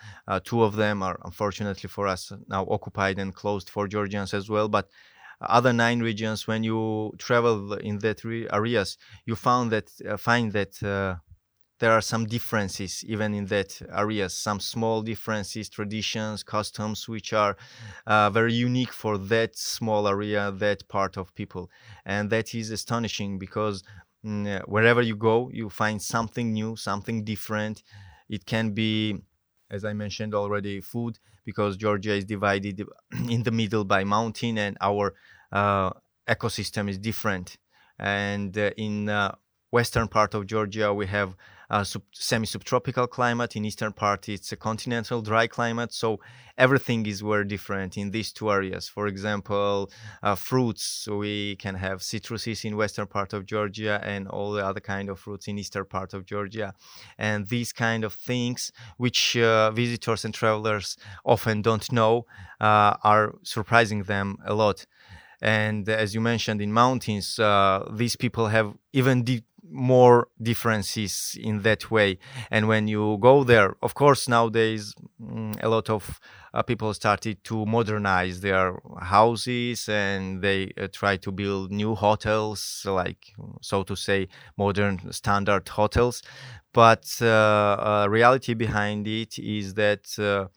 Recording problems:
none

